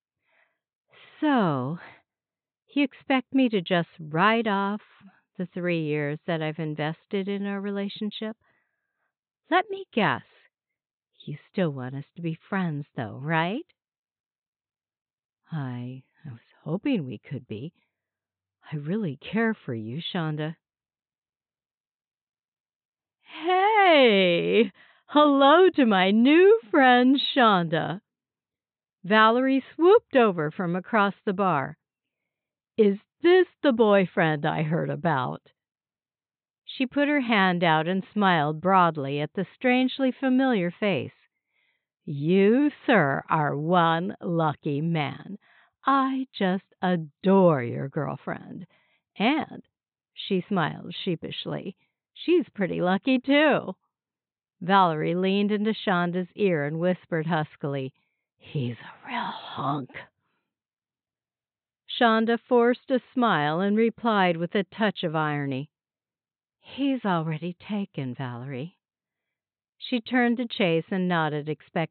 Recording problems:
high frequencies cut off; severe; nothing above 4 kHz

